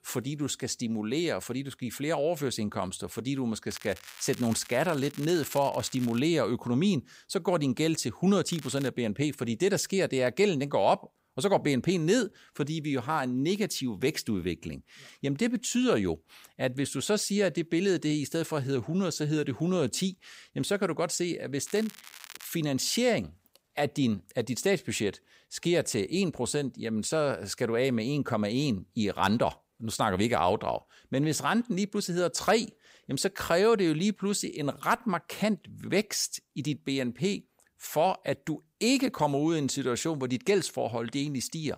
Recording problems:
crackling; noticeable; from 3.5 to 6 s, at 8.5 s and at 22 s; 15 dB below the speech

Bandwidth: 15.5 kHz